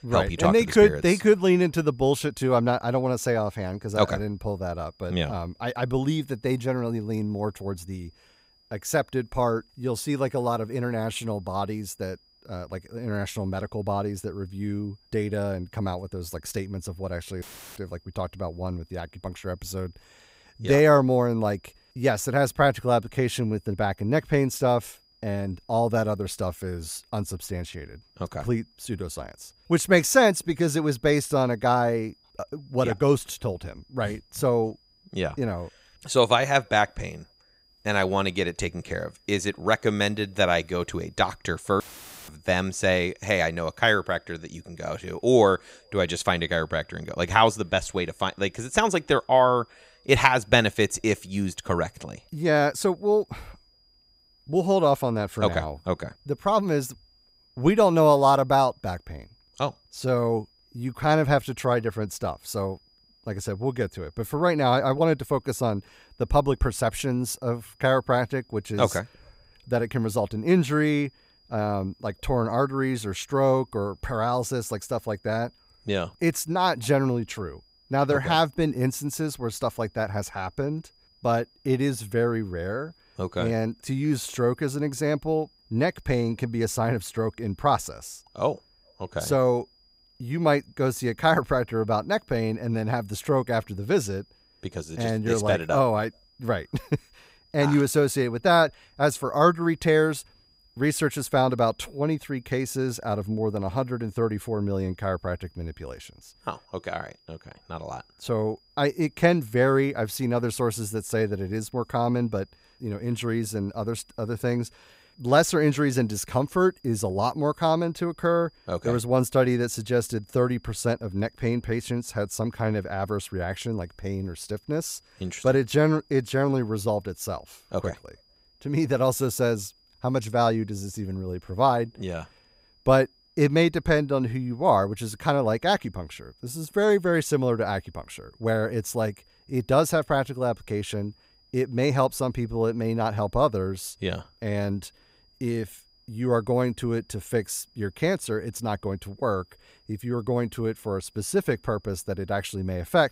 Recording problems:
high-pitched whine; faint; throughout; 5 kHz, 35 dB below the speech
audio cutting out; filled with static; at 17 s and at 42 s

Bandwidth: 15.5 kHz